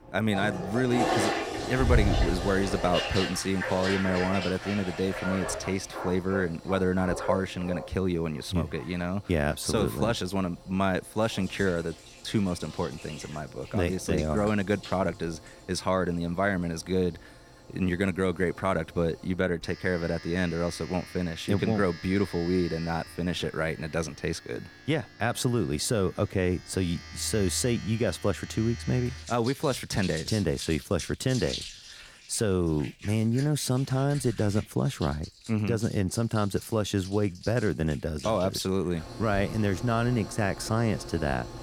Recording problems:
household noises; loud; throughout; 8 dB below the speech

